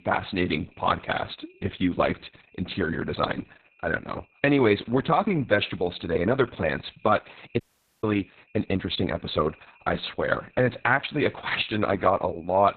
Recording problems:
garbled, watery; badly; nothing above 4 kHz
high-pitched whine; faint; throughout; 2.5 kHz, 30 dB below the speech
audio cutting out; at 7.5 s

